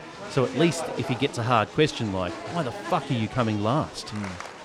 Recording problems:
crowd noise; loud; throughout; 10 dB below the speech

